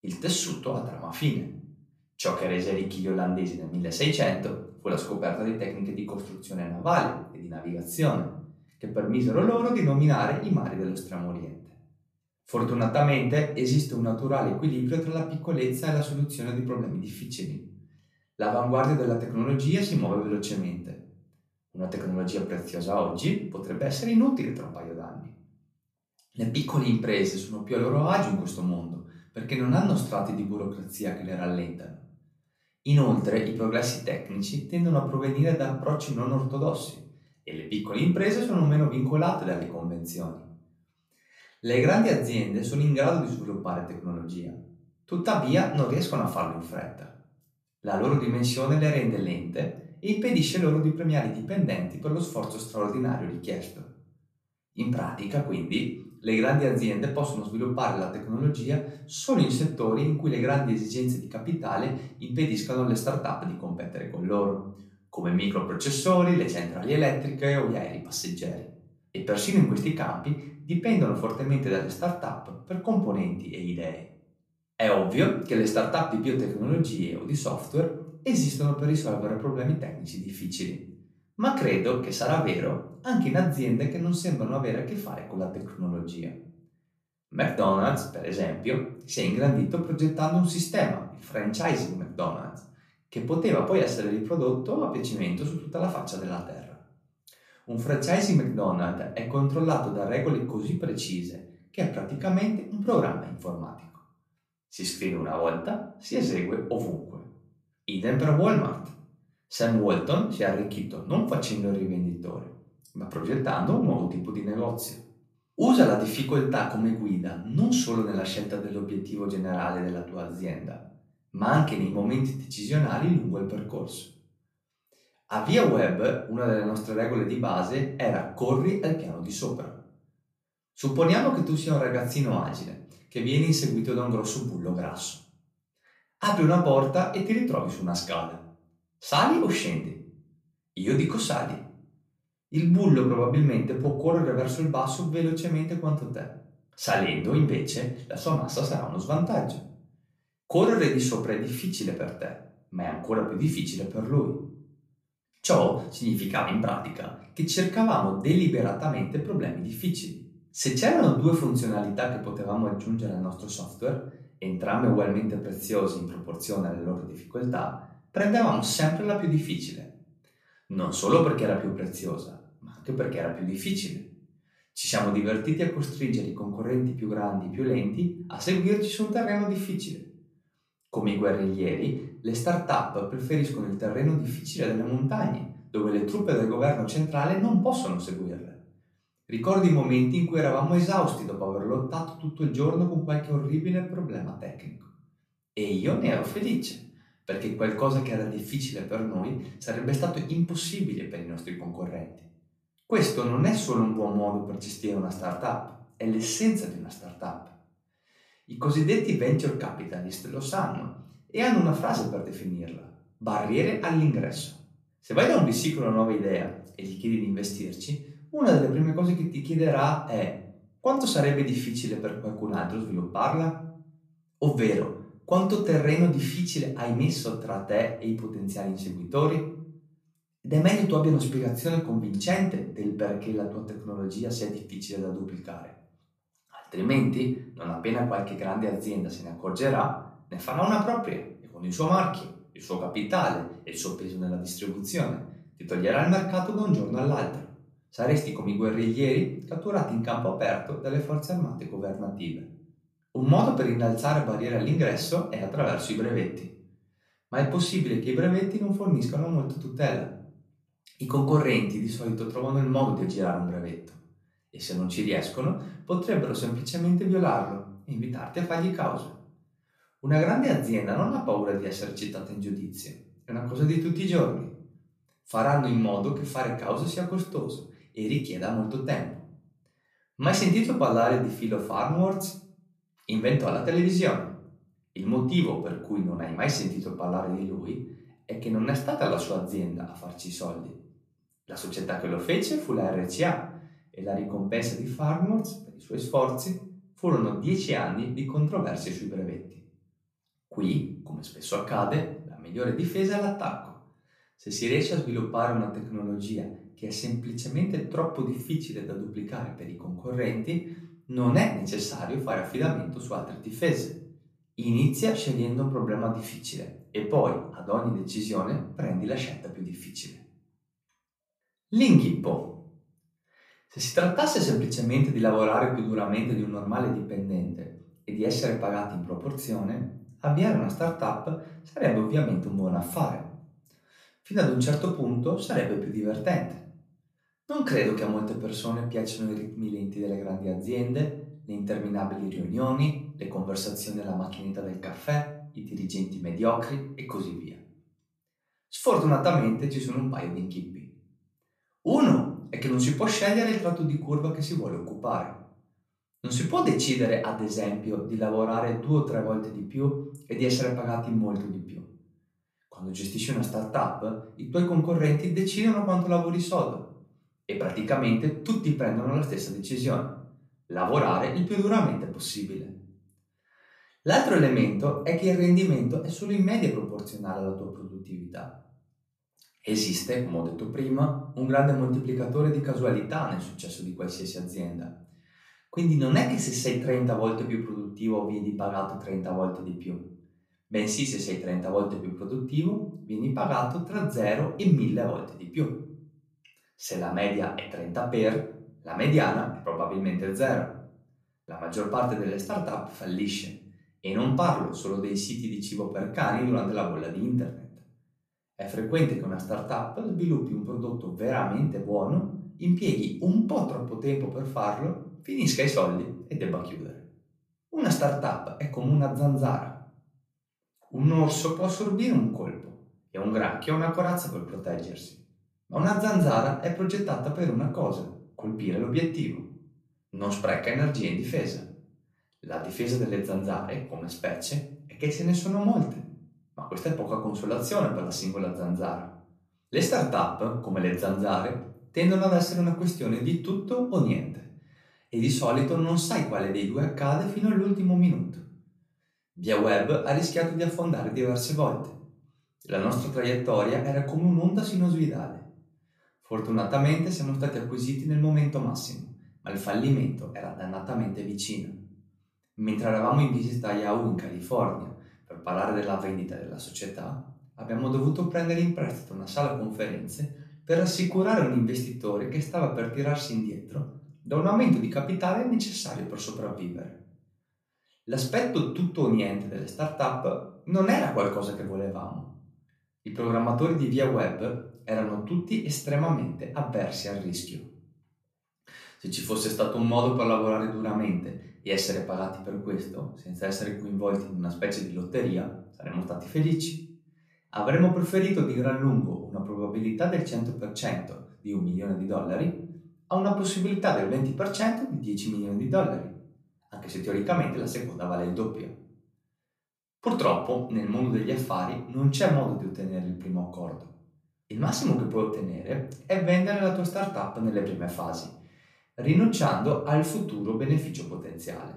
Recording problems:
off-mic speech; far
room echo; slight; dies away in 0.5 s

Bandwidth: 14.5 kHz